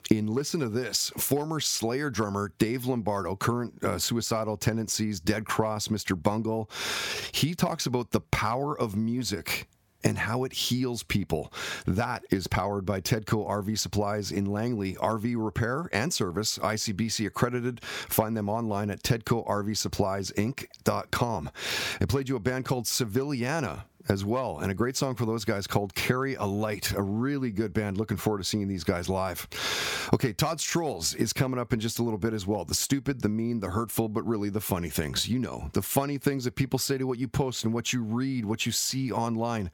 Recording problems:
squashed, flat; somewhat

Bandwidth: 17.5 kHz